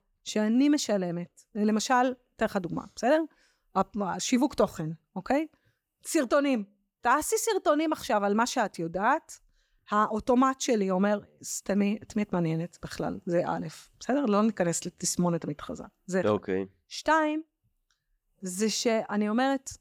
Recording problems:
uneven, jittery; slightly; from 4.5 to 19 s

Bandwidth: 17.5 kHz